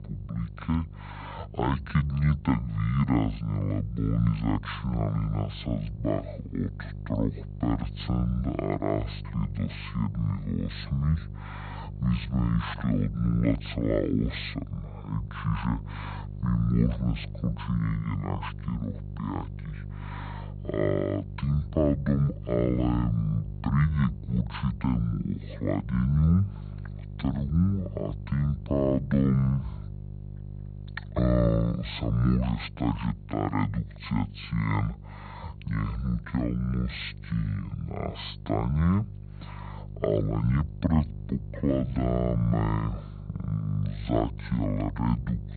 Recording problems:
high frequencies cut off; severe; nothing above 4.5 kHz
wrong speed and pitch; too slow and too low; 0.5 times normal speed
electrical hum; noticeable; throughout; 50 Hz, 20 dB below the speech

